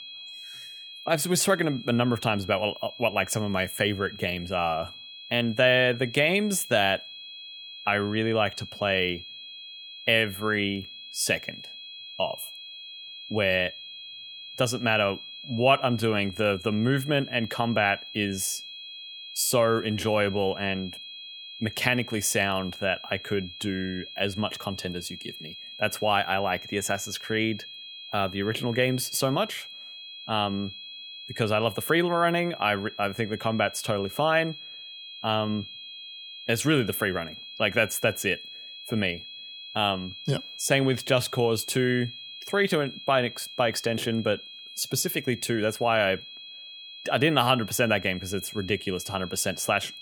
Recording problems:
high-pitched whine; noticeable; throughout; 3.5 kHz, 15 dB below the speech

